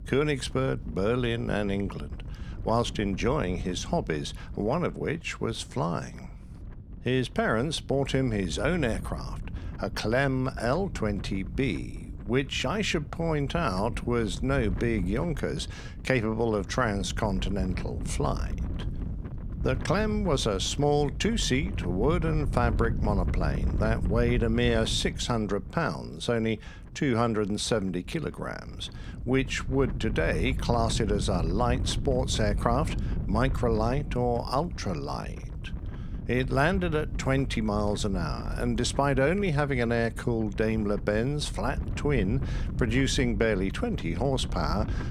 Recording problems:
wind noise on the microphone; occasional gusts; 15 dB below the speech

